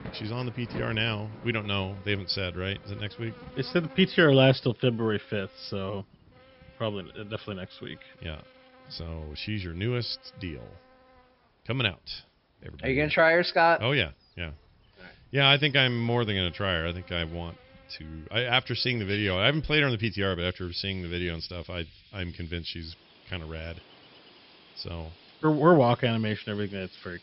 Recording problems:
high frequencies cut off; noticeable; nothing above 5.5 kHz
animal sounds; faint; throughout; 25 dB below the speech
rain or running water; faint; throughout; 25 dB below the speech

